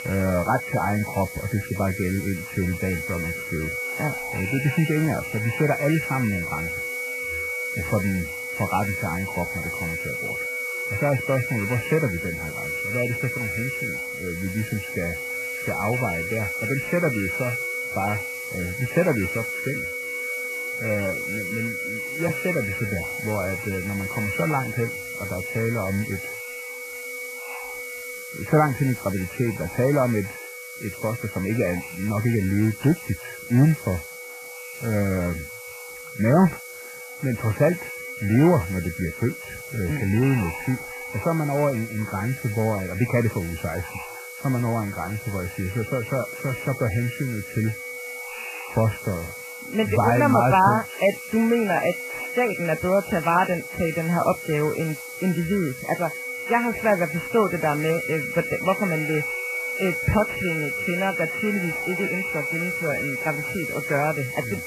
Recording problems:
distortion; heavy; 31% of the sound clipped
garbled, watery; badly; nothing above 3 kHz
high-pitched whine; loud; throughout; 2 kHz, 7 dB below the speech
wind noise on the microphone; occasional gusts; 20 dB below the speech
hiss; noticeable; throughout; 20 dB below the speech

